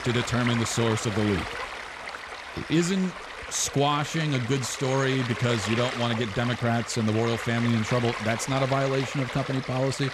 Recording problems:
rain or running water; loud; throughout; 7 dB below the speech

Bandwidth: 13.5 kHz